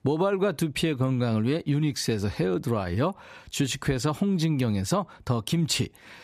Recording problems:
none

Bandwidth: 14.5 kHz